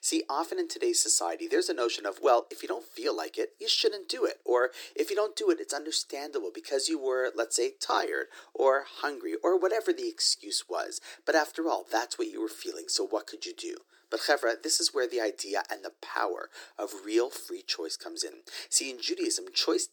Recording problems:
thin; very; fading below 350 Hz

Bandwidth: 18.5 kHz